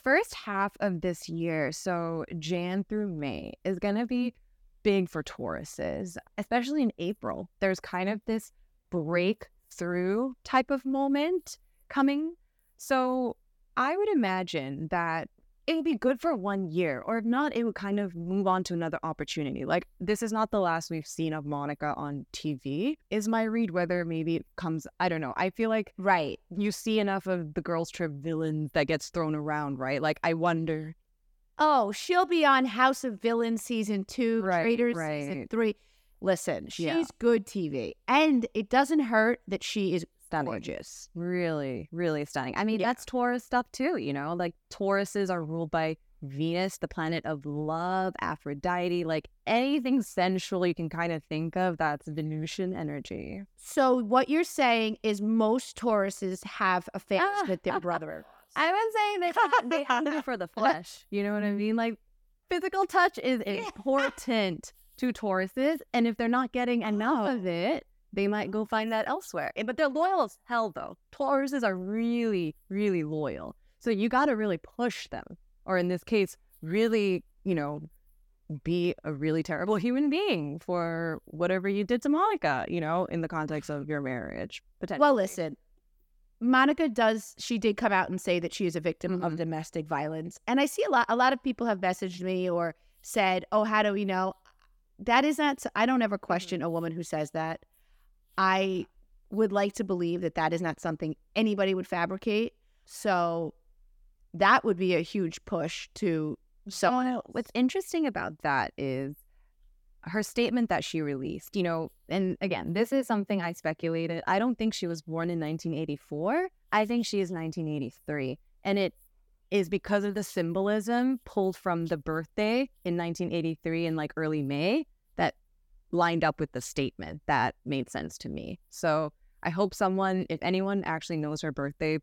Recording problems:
none

